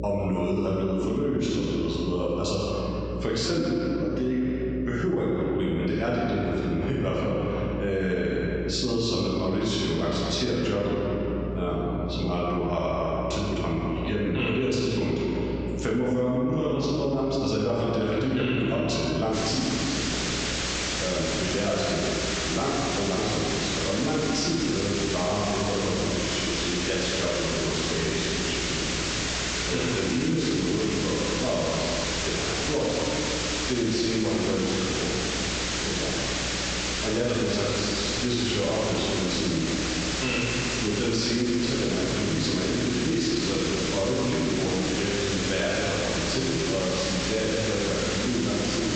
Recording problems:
room echo; strong; dies away in 2.2 s
off-mic speech; far
high frequencies cut off; noticeable; nothing above 8 kHz
squashed, flat; somewhat
hiss; loud; from 19 s on; 2 dB below the speech
electrical hum; noticeable; throughout; 60 Hz, 15 dB below the speech

